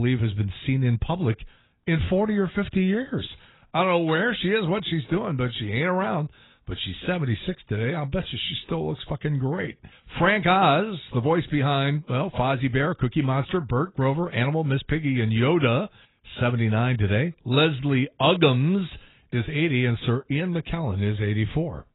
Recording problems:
garbled, watery; badly; nothing above 4 kHz
abrupt cut into speech; at the start

